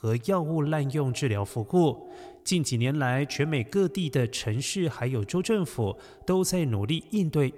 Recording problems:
echo of what is said; faint; throughout; 130 ms later, 20 dB below the speech

